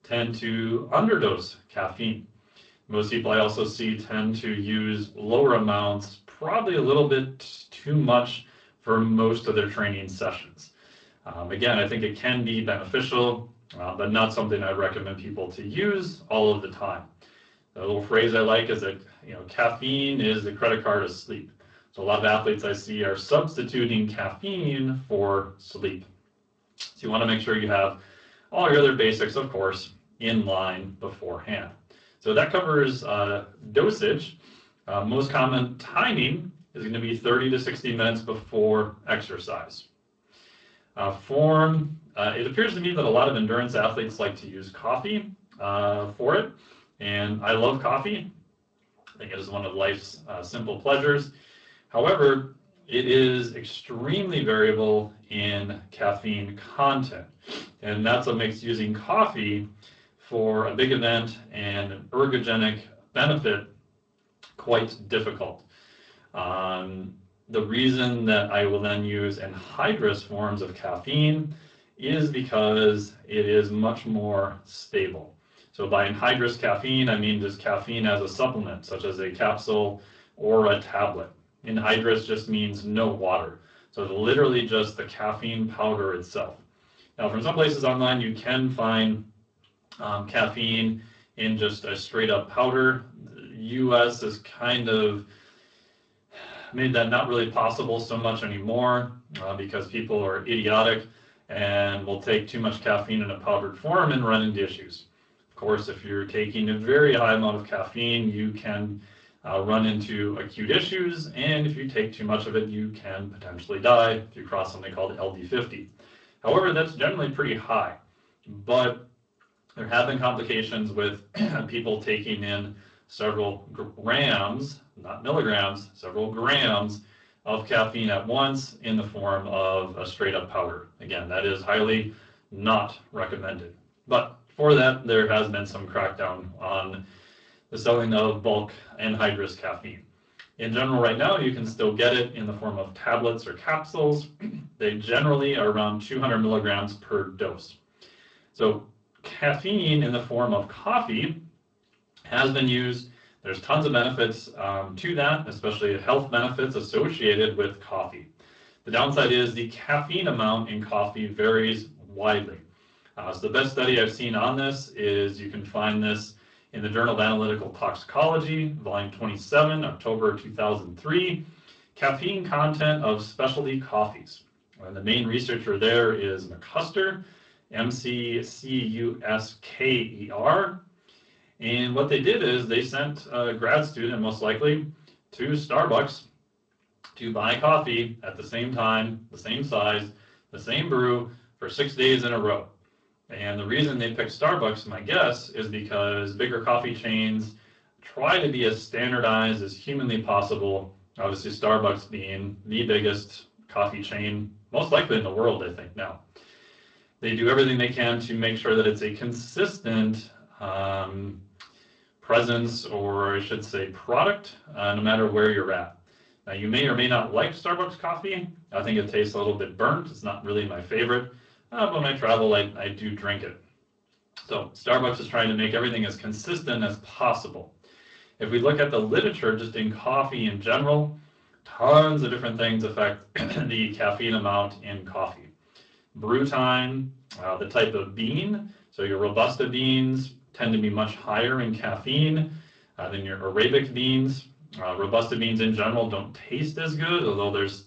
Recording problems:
off-mic speech; far
room echo; very slight; dies away in 0.3 s
garbled, watery; slightly; nothing above 7.5 kHz

